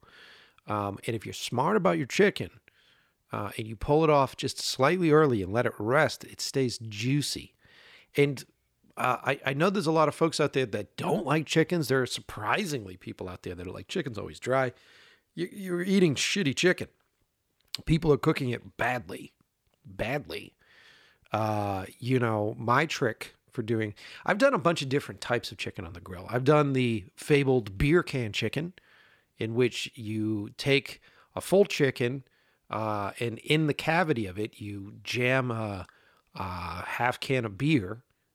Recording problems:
none

